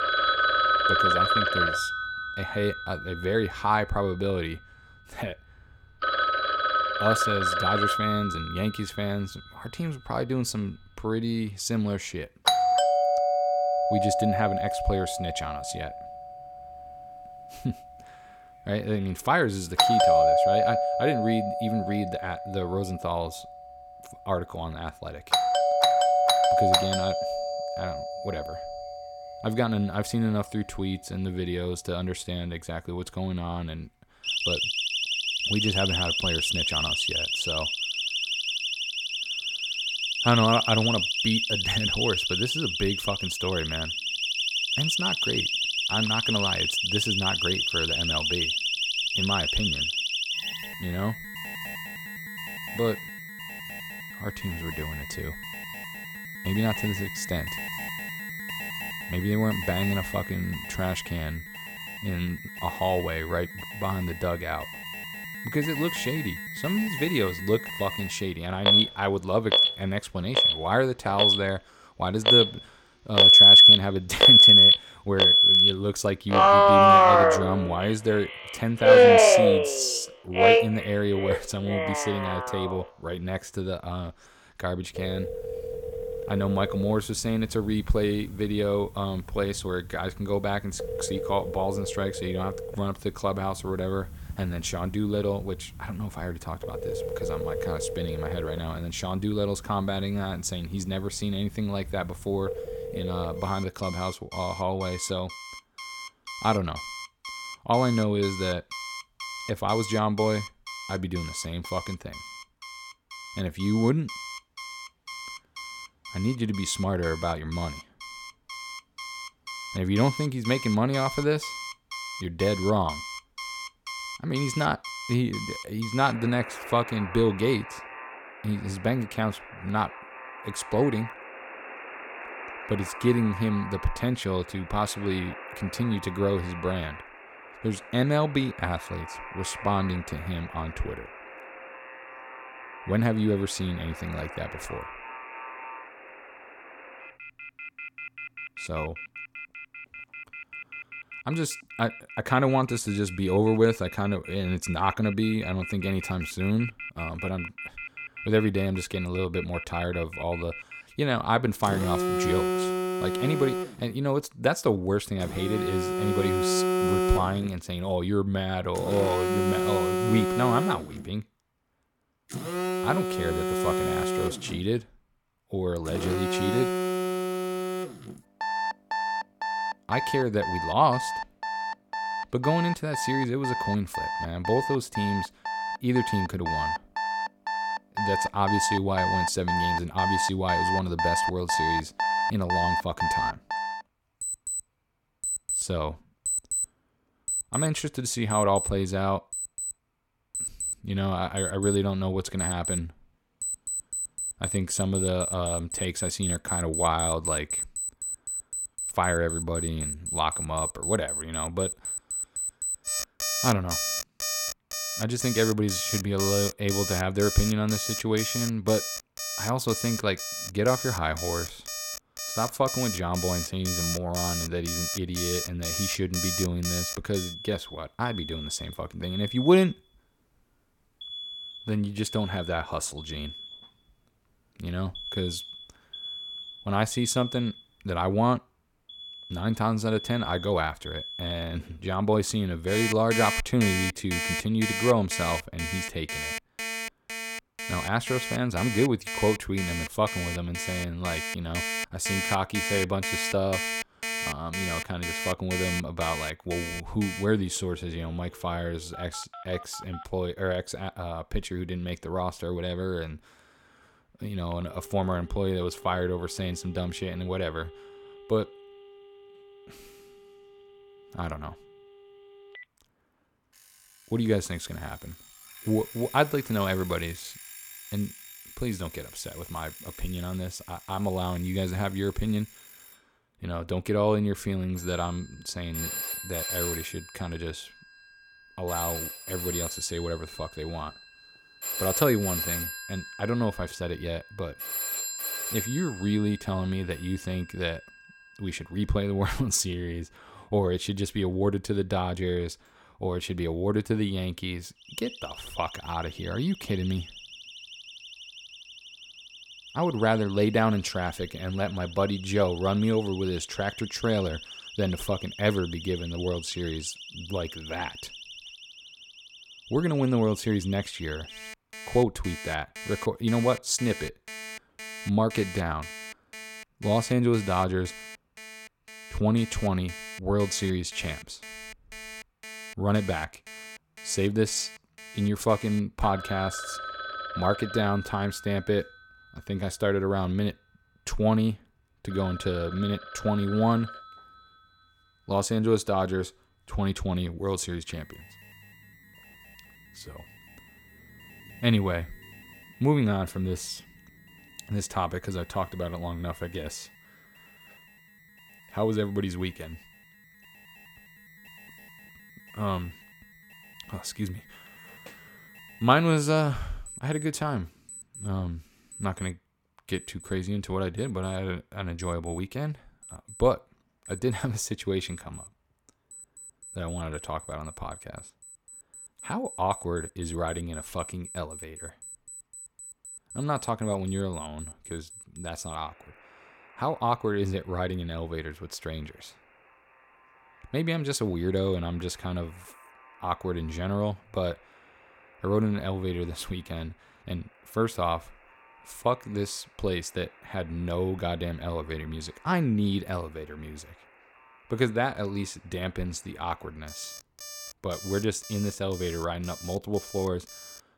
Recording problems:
alarms or sirens; very loud; throughout; 4 dB above the speech

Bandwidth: 17 kHz